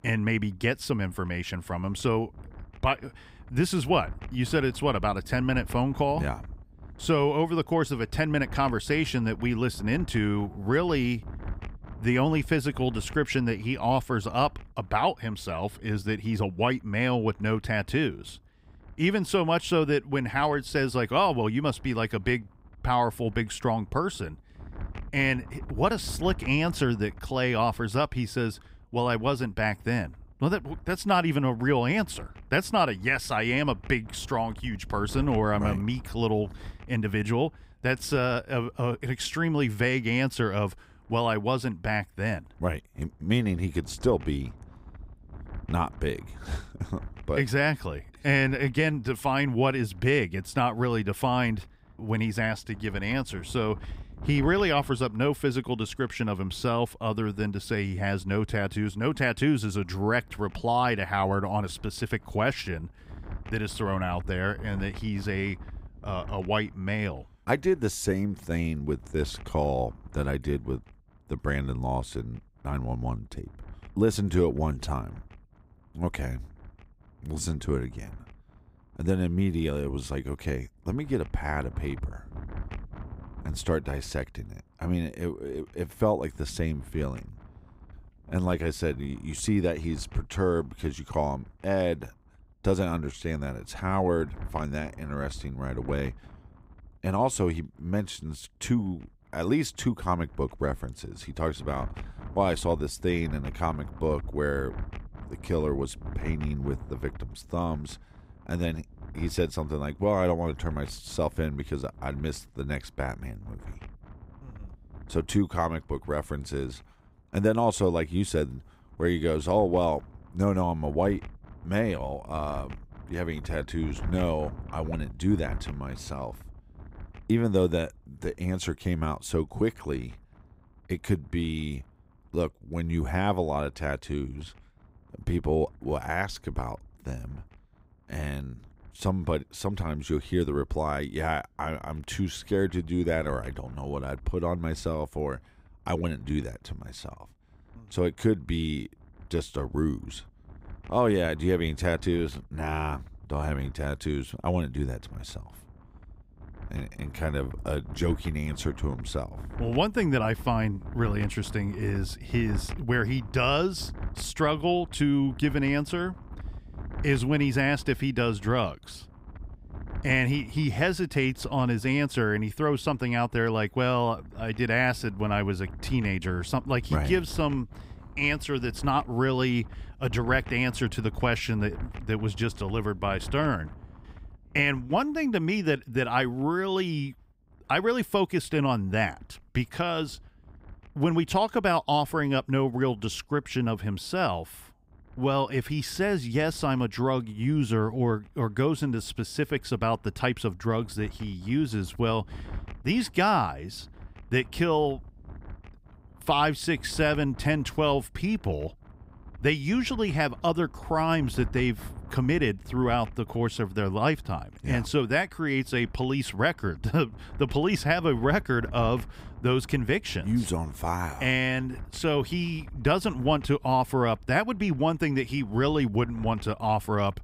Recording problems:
wind noise on the microphone; occasional gusts; 25 dB below the speech

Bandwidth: 15.5 kHz